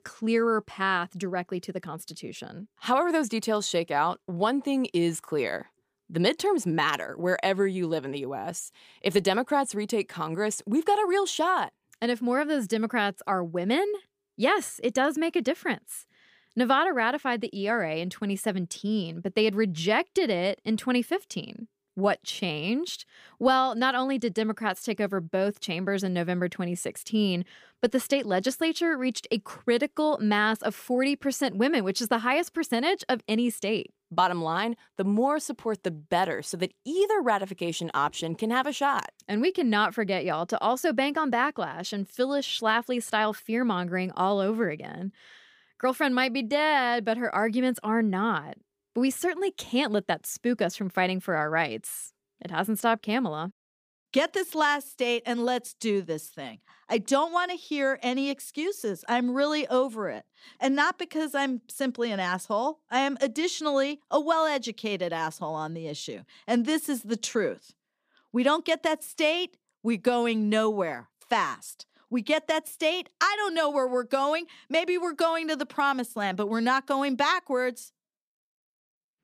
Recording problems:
none

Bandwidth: 15 kHz